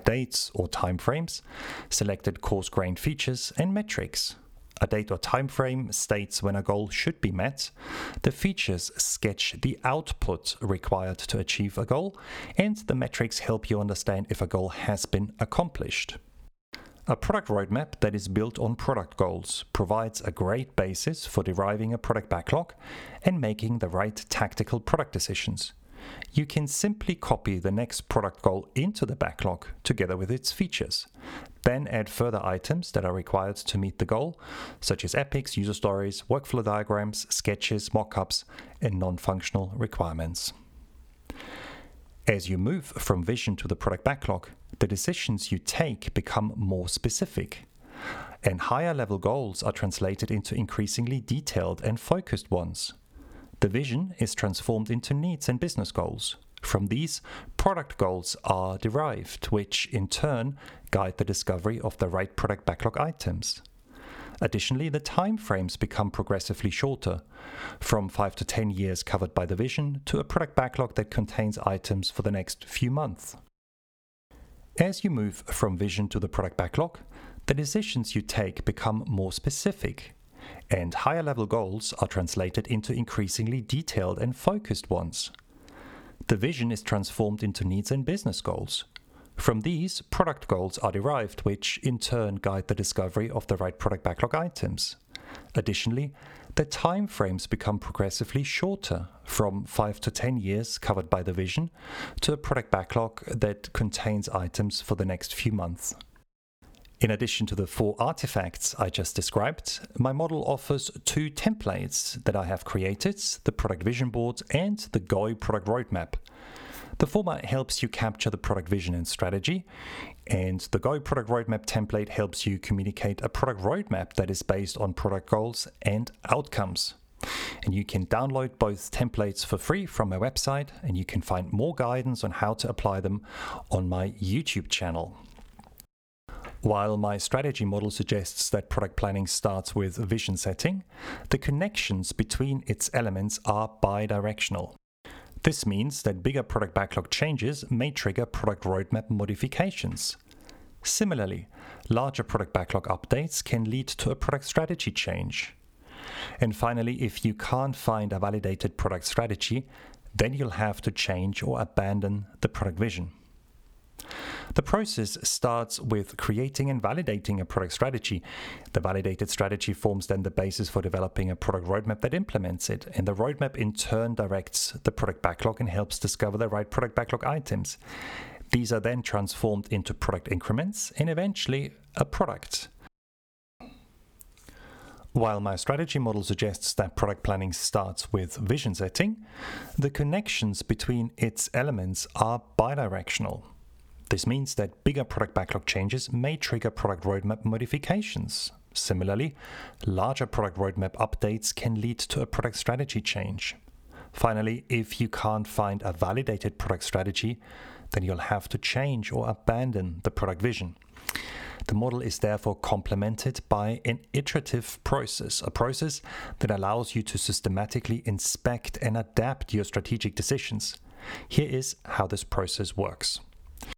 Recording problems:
squashed, flat; somewhat

